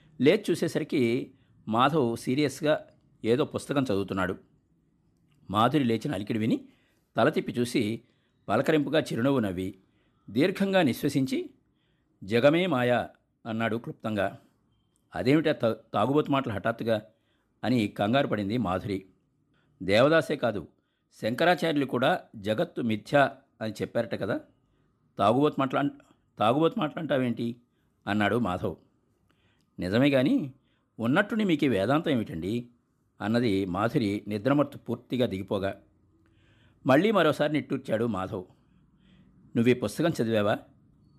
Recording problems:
none

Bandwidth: 13.5 kHz